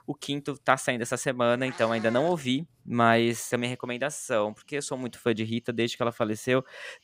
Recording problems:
animal sounds; noticeable; throughout; 15 dB below the speech

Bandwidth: 15.5 kHz